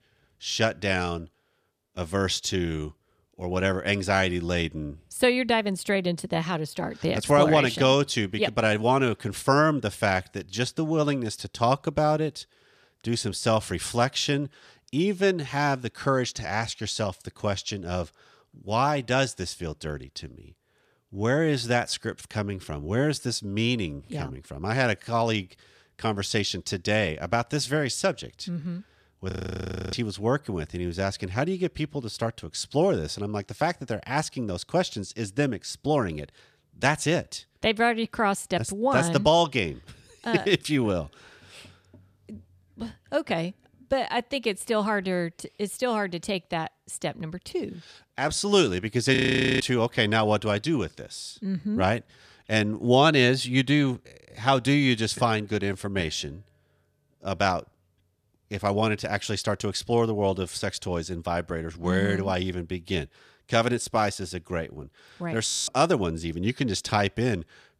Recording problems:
audio freezing; at 29 s for 0.5 s, at 49 s and at 1:05

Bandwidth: 14.5 kHz